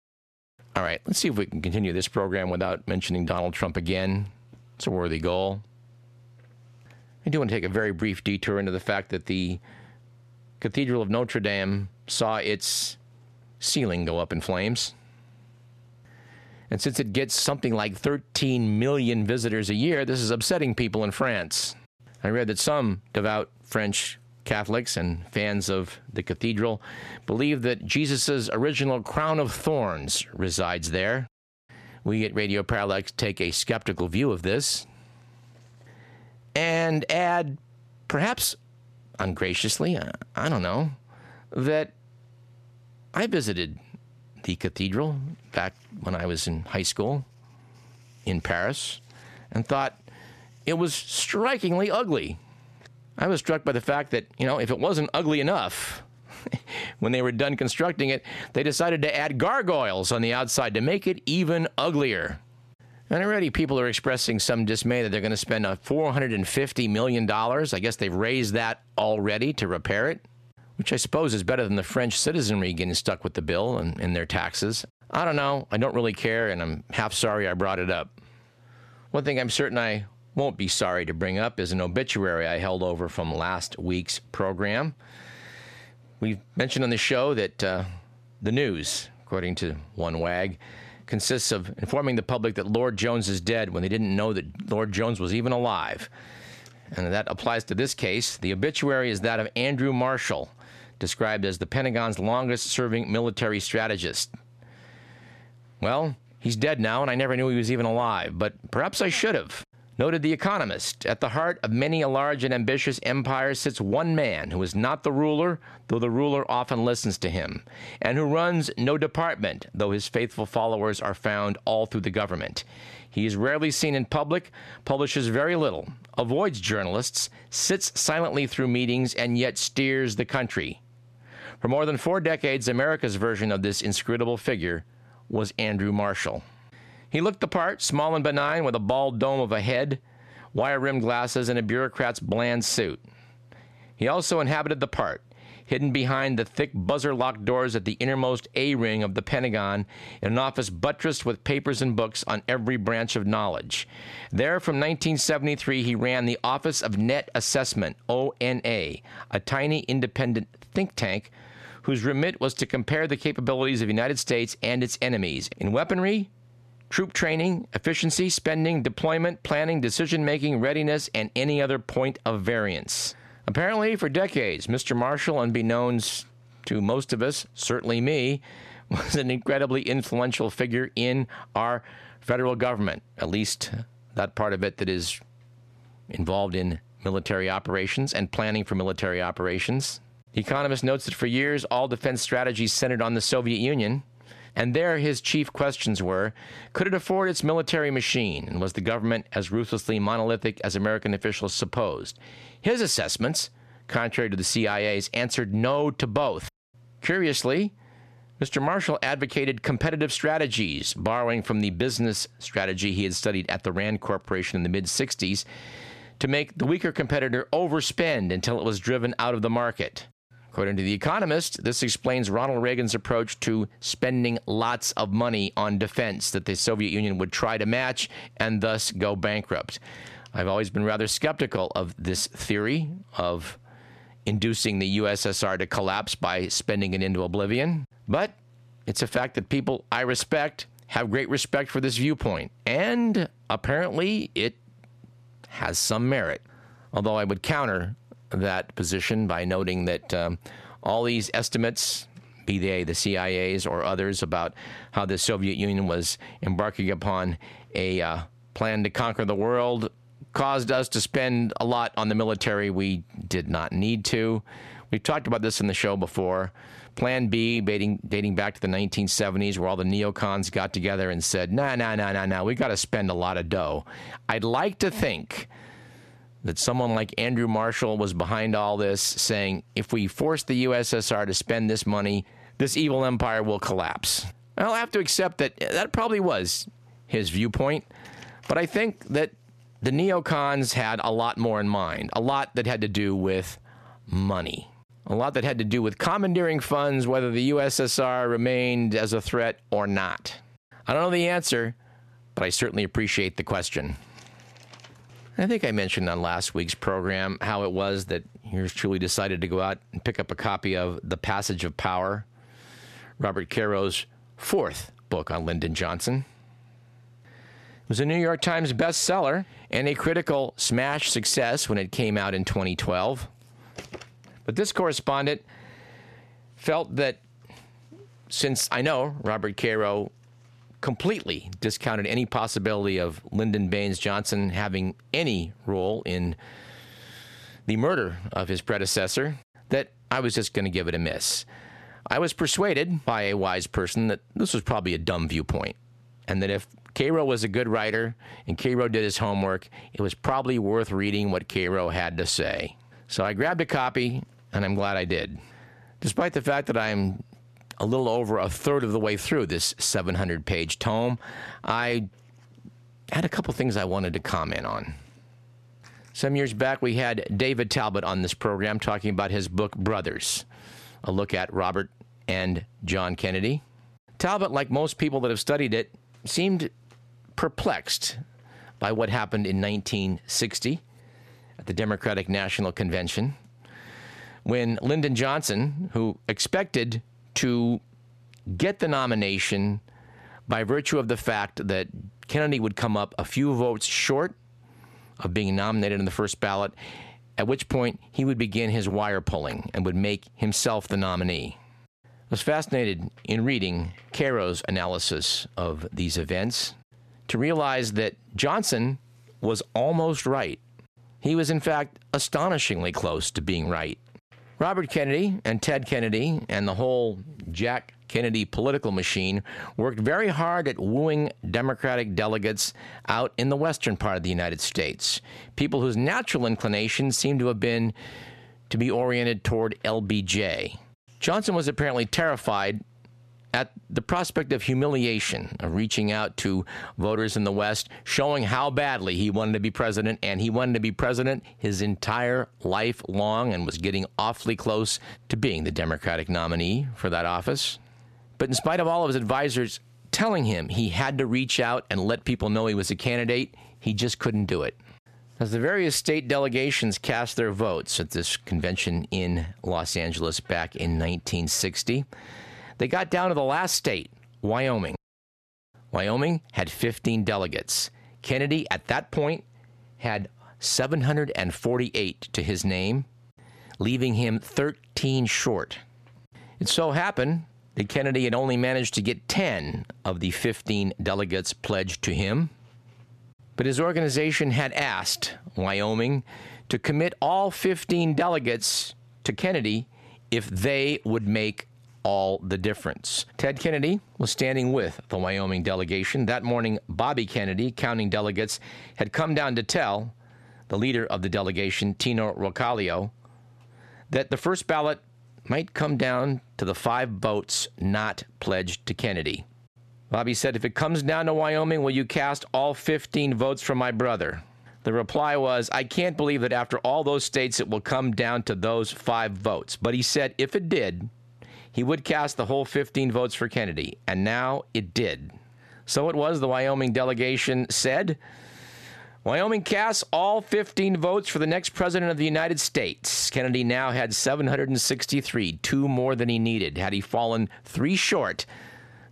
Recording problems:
squashed, flat; heavily

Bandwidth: 13.5 kHz